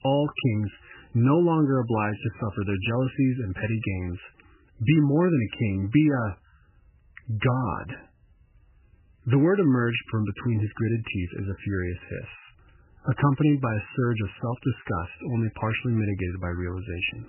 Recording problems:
garbled, watery; badly; nothing above 3 kHz

